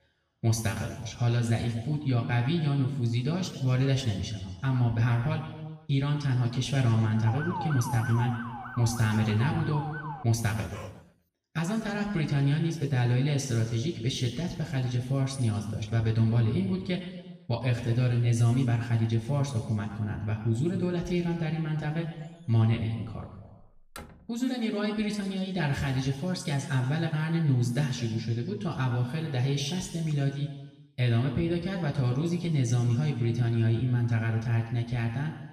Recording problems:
off-mic speech; far
room echo; noticeable; dies away in 1.2 s
siren; noticeable; from 7.5 to 10 s; peak 7 dB below the speech
dog barking; faint; at 11 s; peak 15 dB below the speech
door banging; faint; from 23 to 24 s; peak 15 dB below the speech

